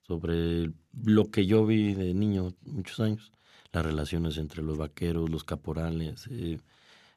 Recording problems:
none

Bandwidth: 13.5 kHz